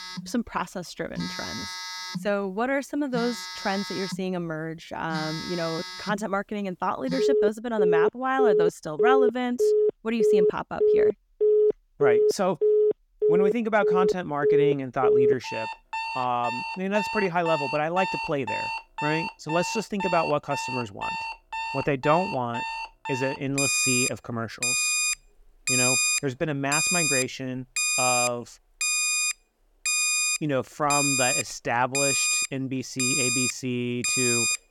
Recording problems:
alarms or sirens; very loud; throughout; 4 dB above the speech

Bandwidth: 17.5 kHz